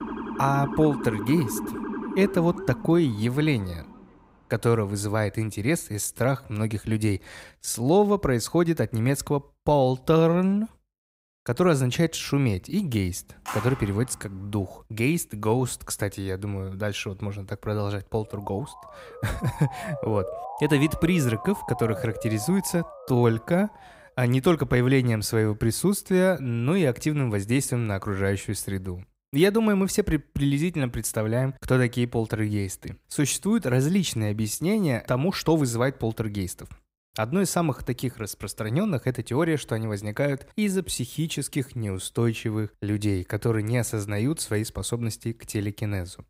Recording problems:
siren; noticeable; until 4 s and from 18 to 24 s; peak 6 dB below the speech
uneven, jittery; strongly; from 2.5 to 42 s
phone ringing; noticeable; at 13 s; peak 8 dB below the speech

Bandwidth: 15.5 kHz